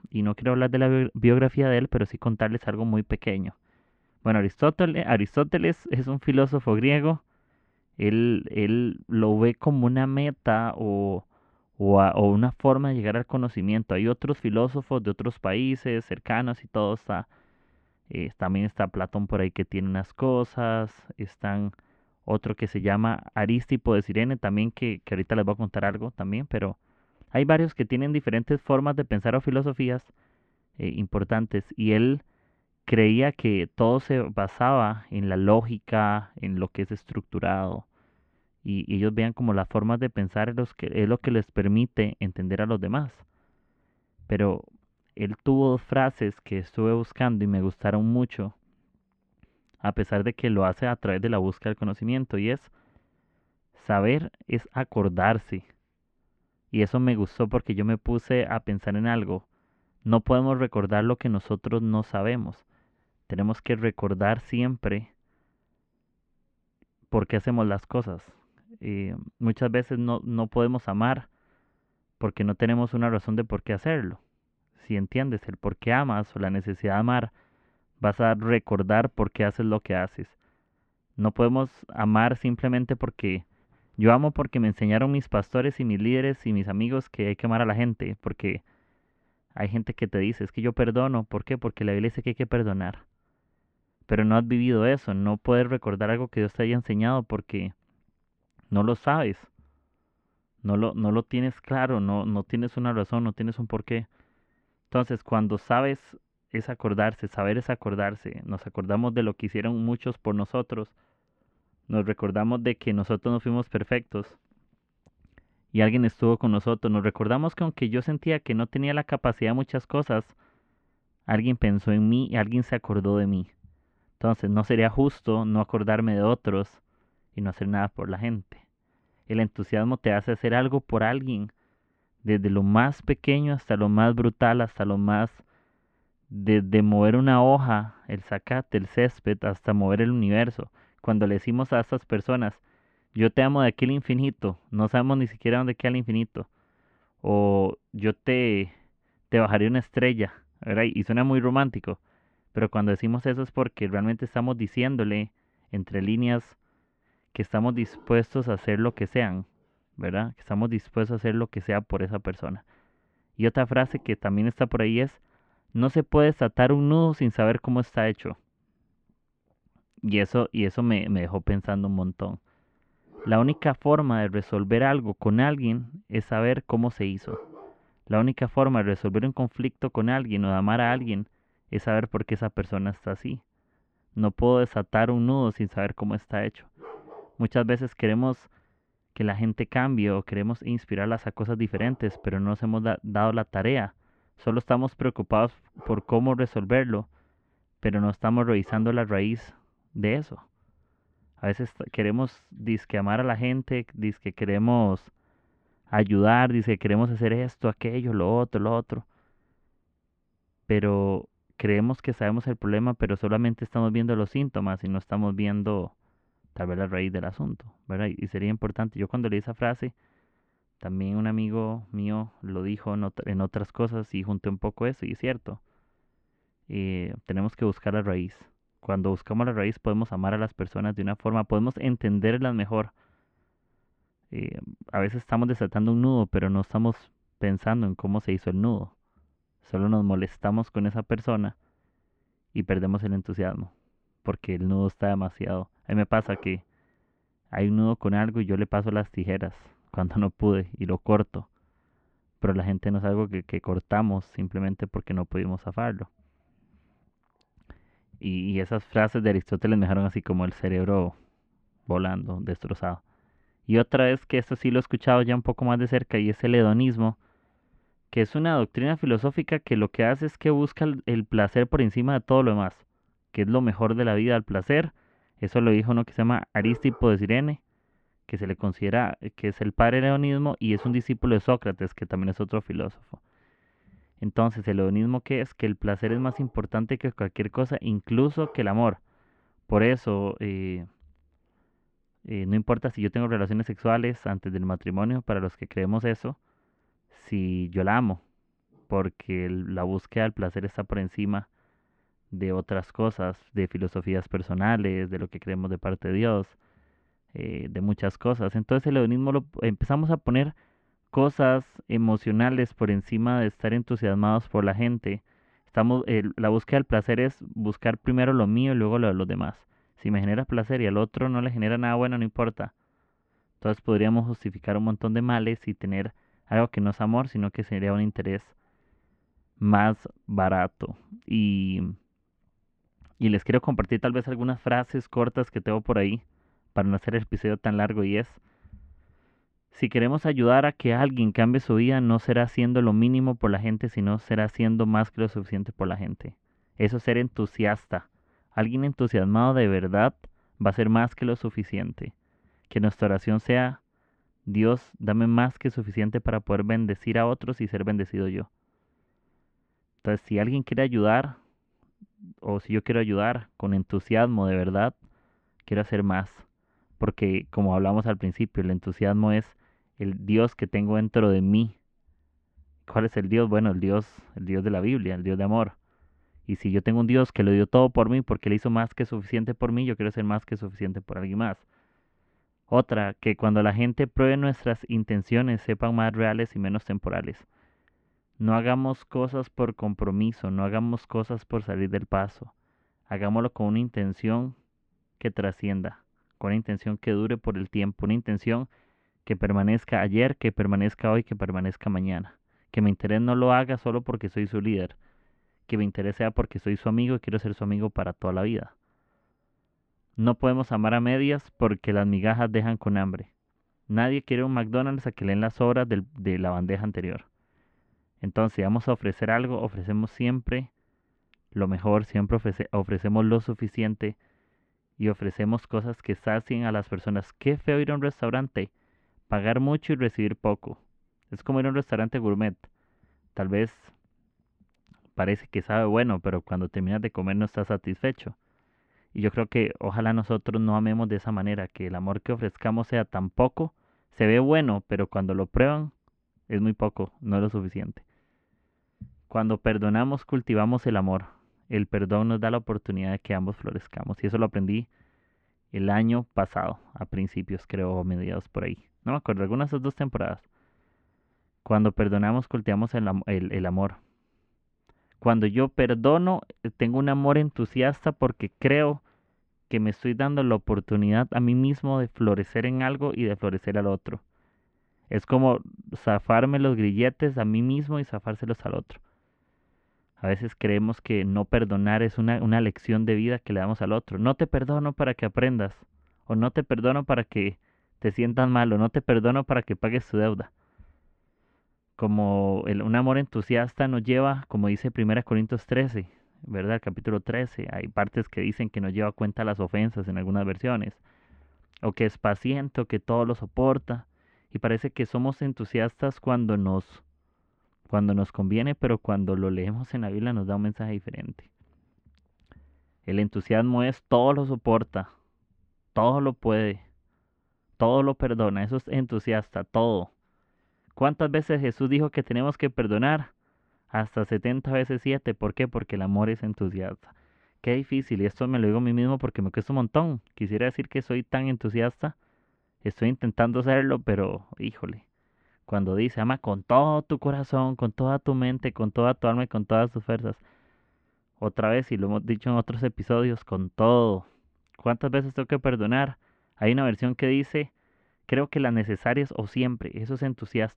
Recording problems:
muffled; very; fading above 3 kHz

